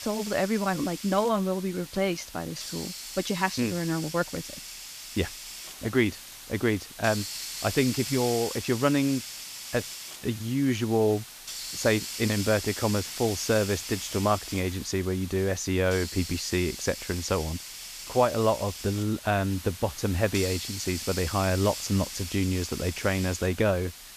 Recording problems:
hiss; loud; throughout; 9 dB below the speech

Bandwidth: 14.5 kHz